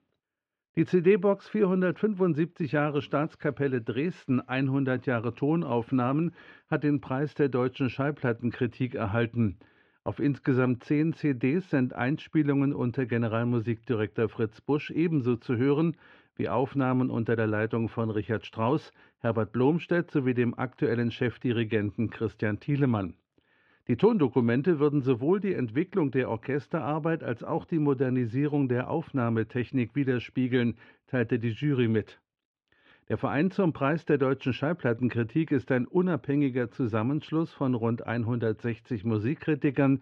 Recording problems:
muffled; very; fading above 3.5 kHz

